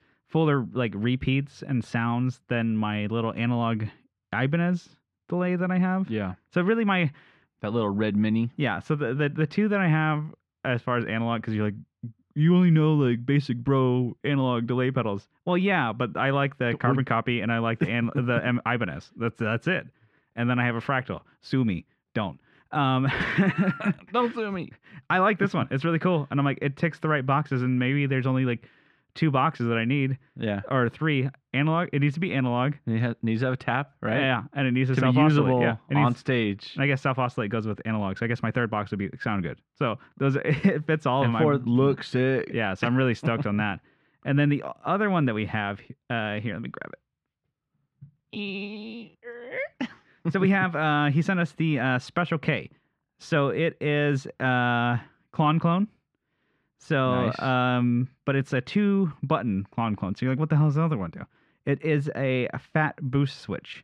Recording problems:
muffled; slightly; fading above 2.5 kHz

